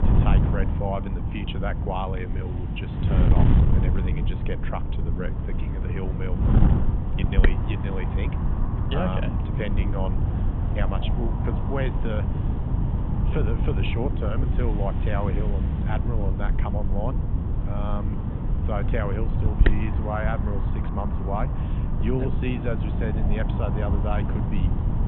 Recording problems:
high frequencies cut off; severe; nothing above 3.5 kHz
wind noise on the microphone; heavy; 2 dB below the speech

